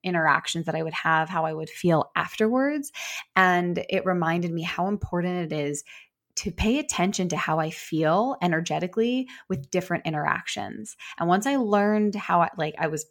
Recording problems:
none

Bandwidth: 18 kHz